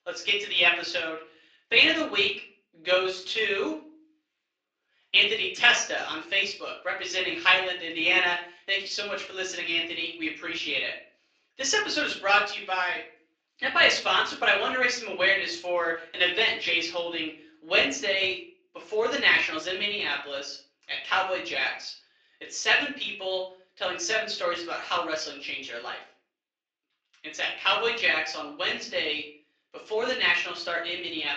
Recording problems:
off-mic speech; far
thin; somewhat; fading below 400 Hz
room echo; slight; dies away in 0.4 s
garbled, watery; slightly

